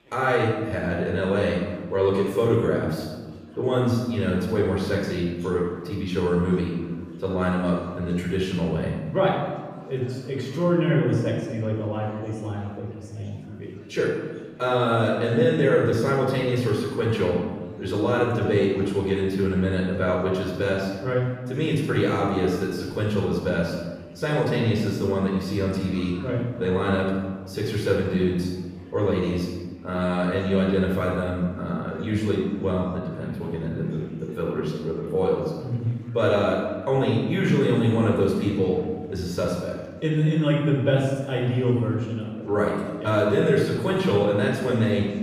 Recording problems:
off-mic speech; far
room echo; noticeable; dies away in 1.2 s
chatter from many people; faint; throughout; 25 dB below the speech

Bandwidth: 15 kHz